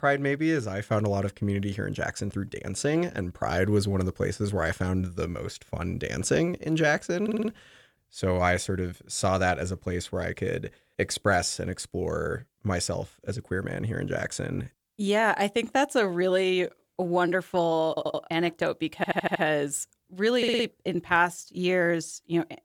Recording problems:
audio stuttering; 4 times, first at 7 s

